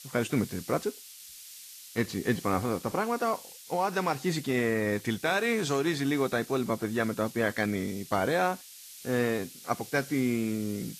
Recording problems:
garbled, watery; slightly
hiss; noticeable; throughout; 15 dB below the speech

